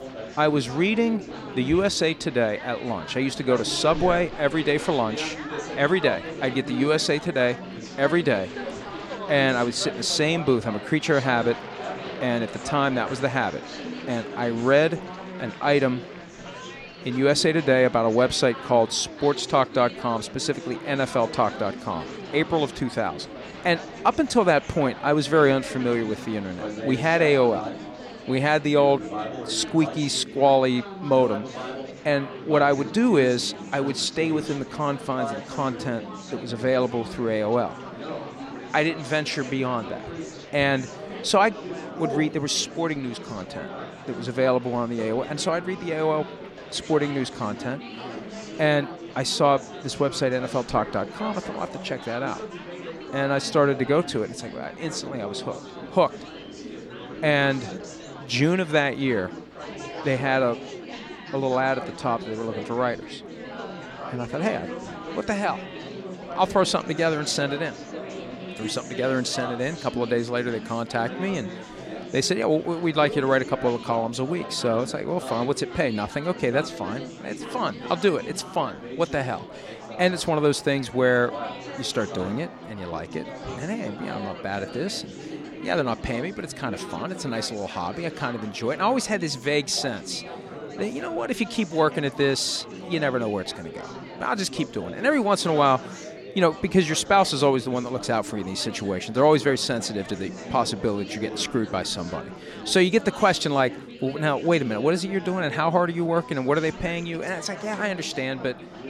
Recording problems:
chatter from many people; noticeable; throughout; 10 dB below the speech

